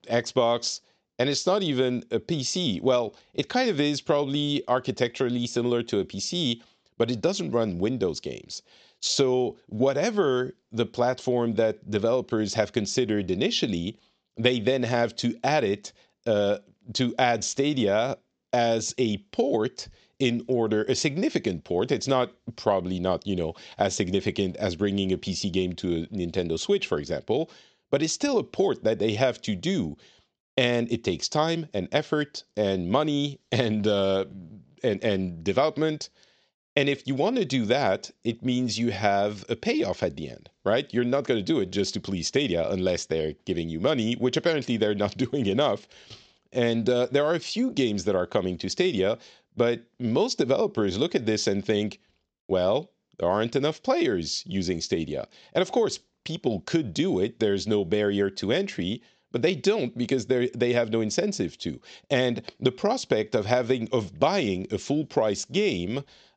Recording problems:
high frequencies cut off; noticeable; nothing above 8 kHz

